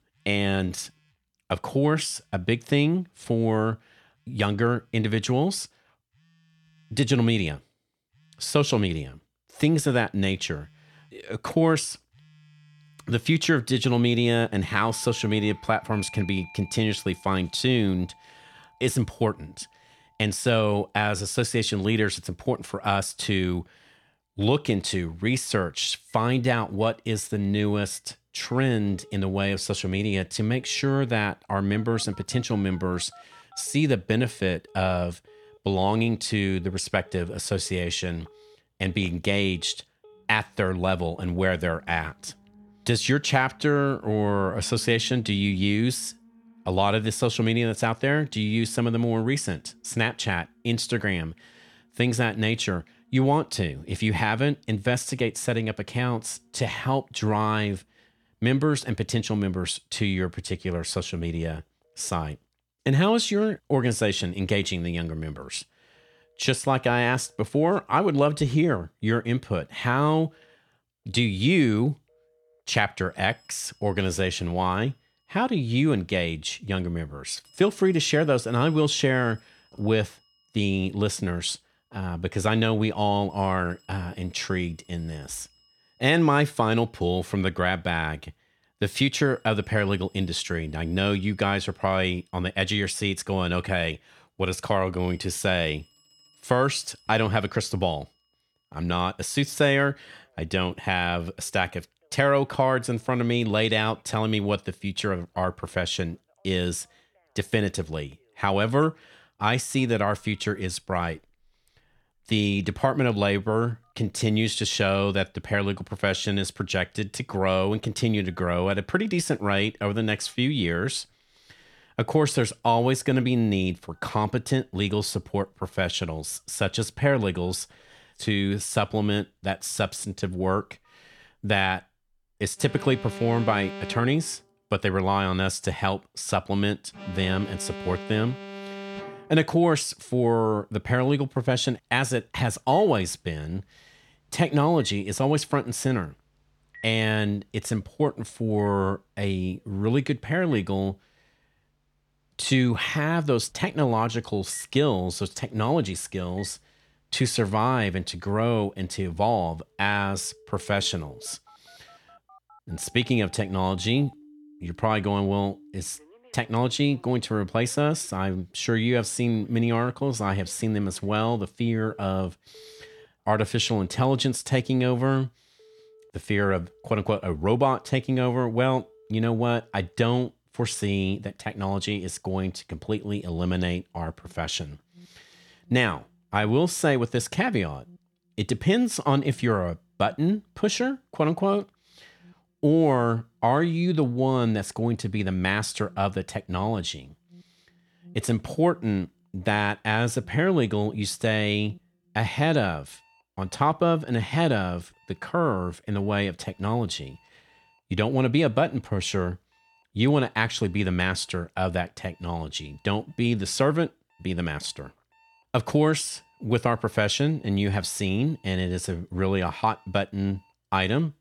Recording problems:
alarms or sirens; faint; throughout; 25 dB below the speech

